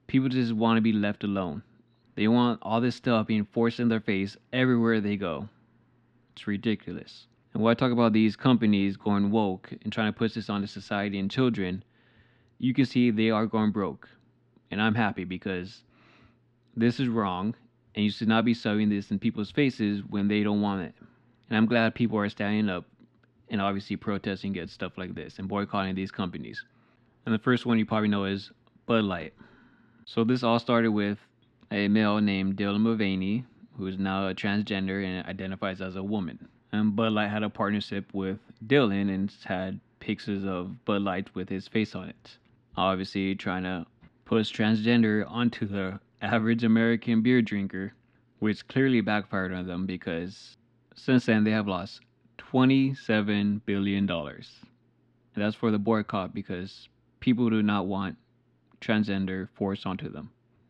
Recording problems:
muffled; very slightly; fading above 3 kHz

